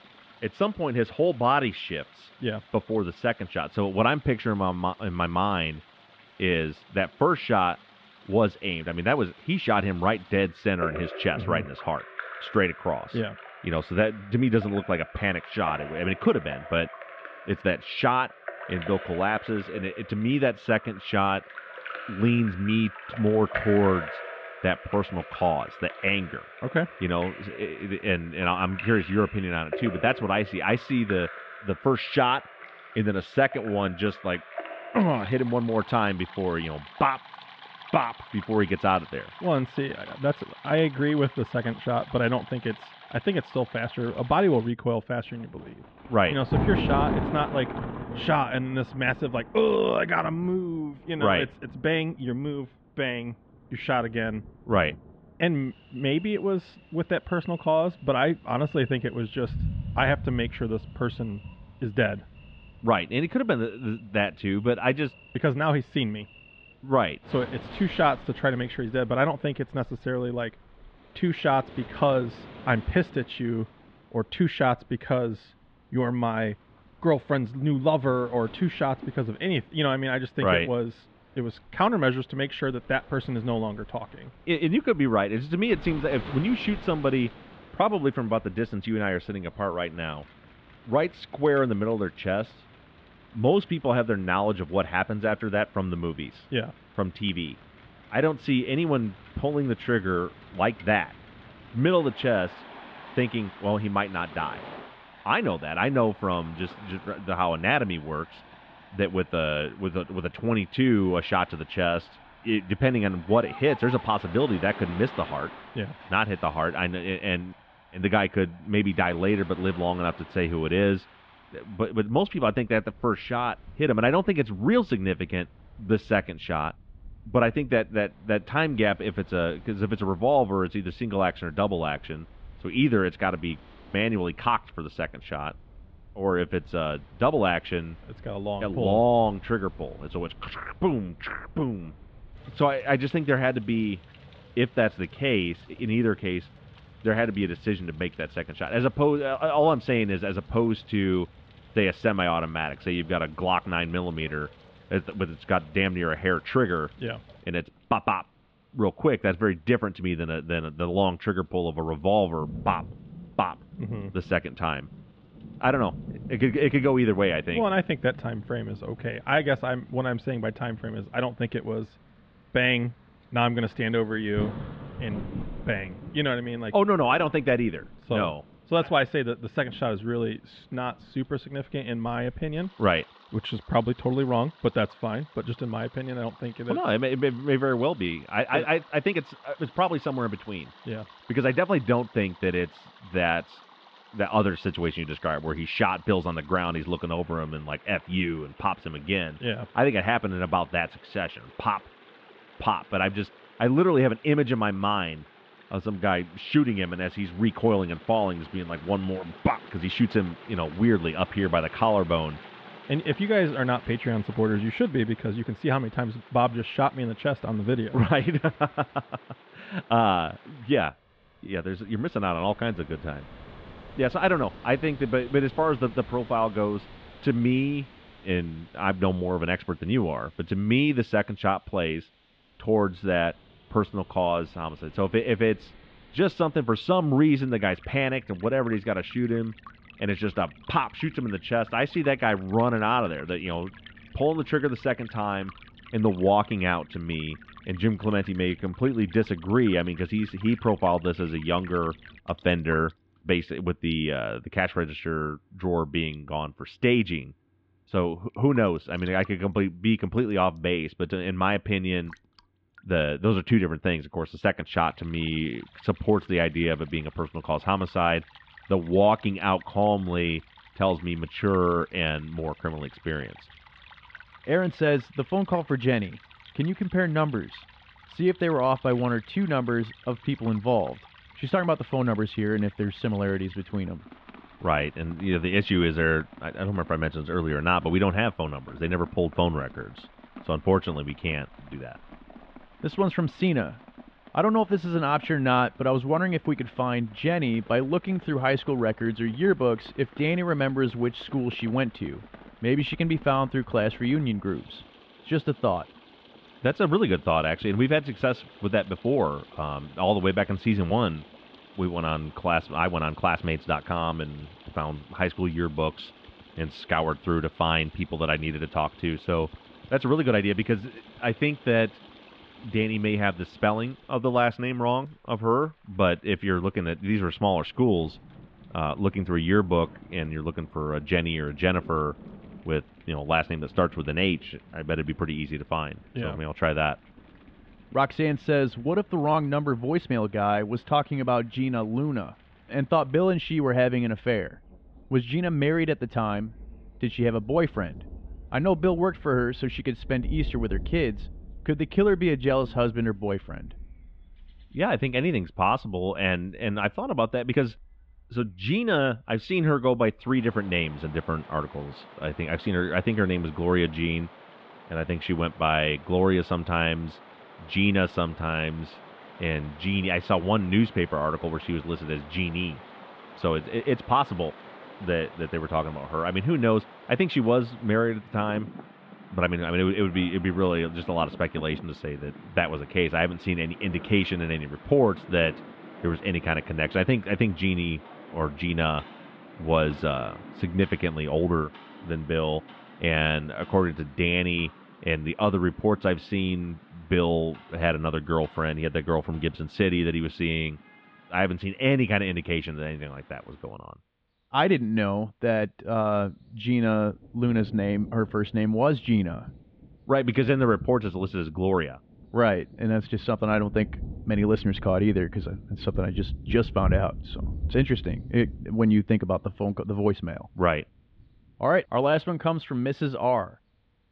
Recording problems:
muffled; very; fading above 3.5 kHz
rain or running water; noticeable; throughout; 20 dB below the speech

